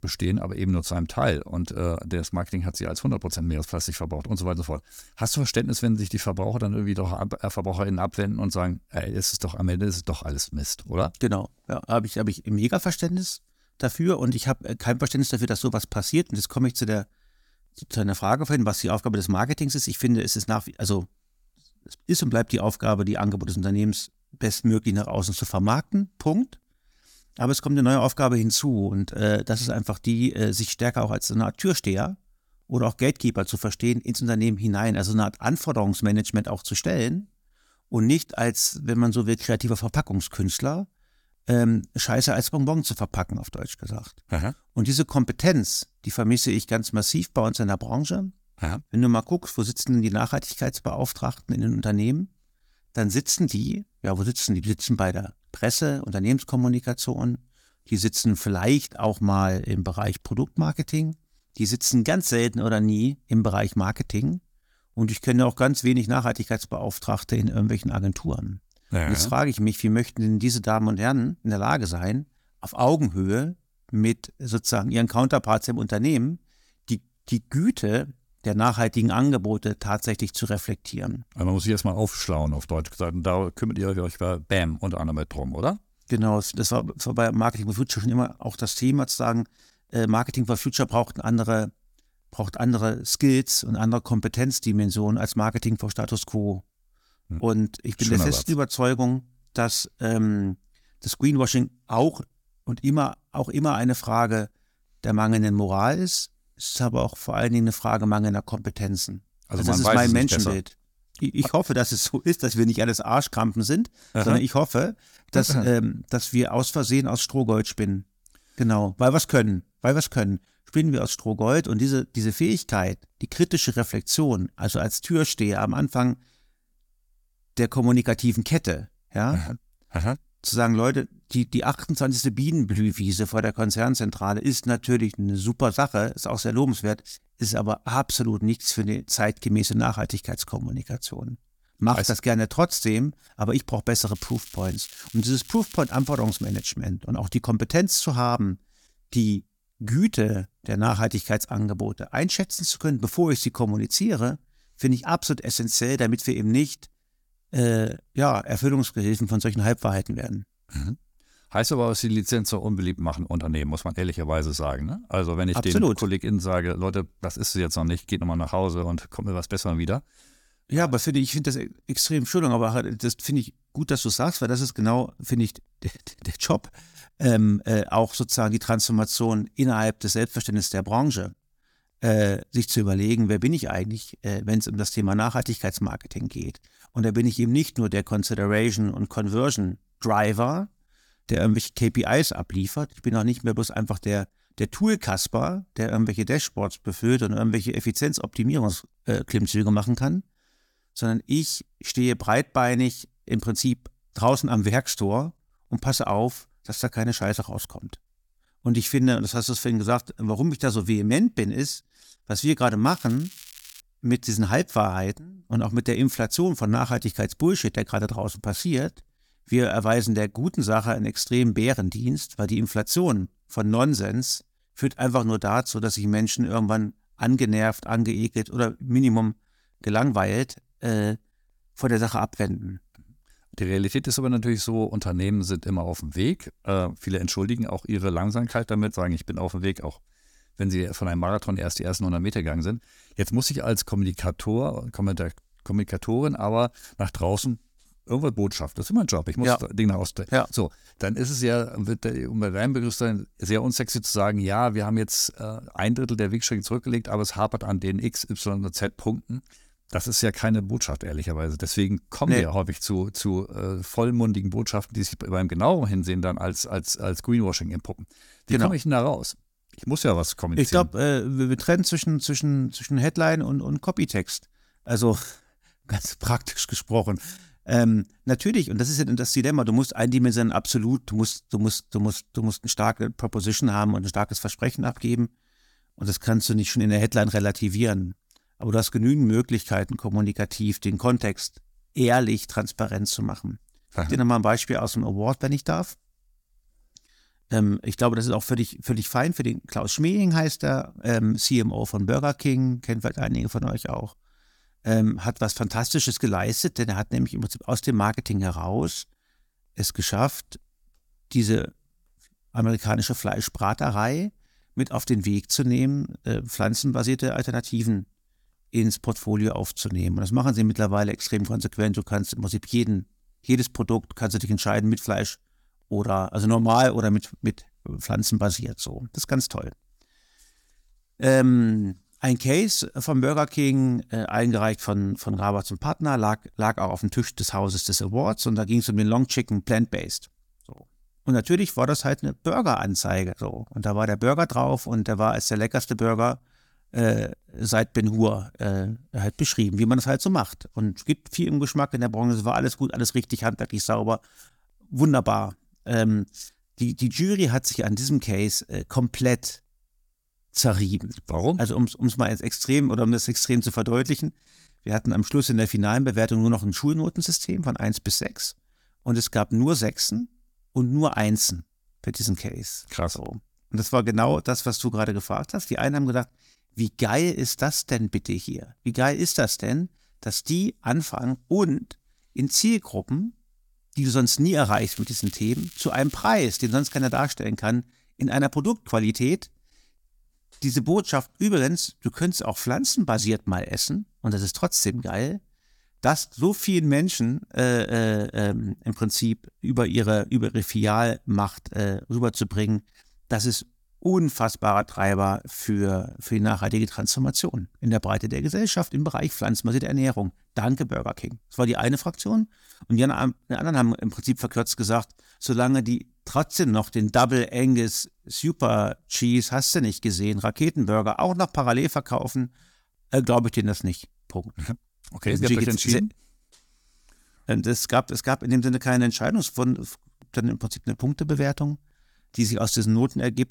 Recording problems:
crackling; noticeable; from 2:24 to 2:27, at 3:33 and from 6:25 to 6:27; 20 dB below the speech

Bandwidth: 18 kHz